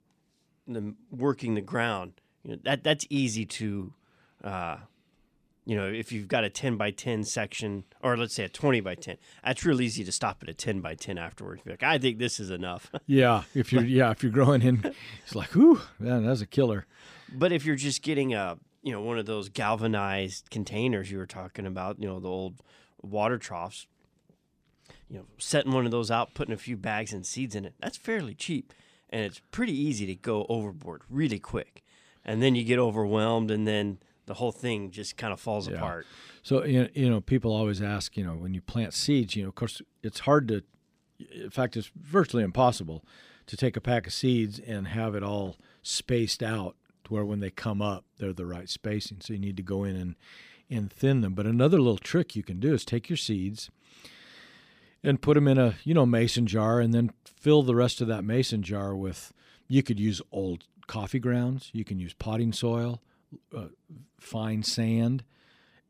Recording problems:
none

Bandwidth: 15 kHz